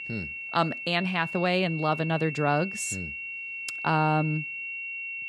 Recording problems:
high-pitched whine; loud; throughout; 2.5 kHz, 6 dB below the speech

